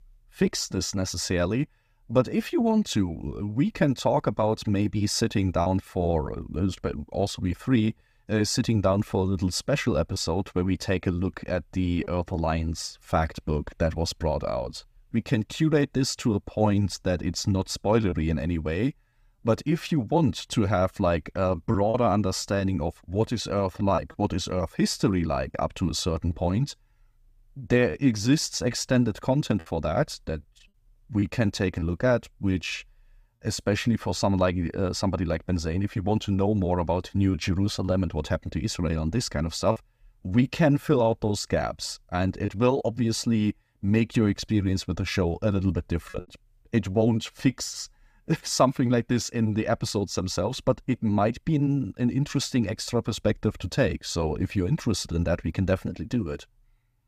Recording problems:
choppy; occasionally; 1% of the speech affected

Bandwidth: 15 kHz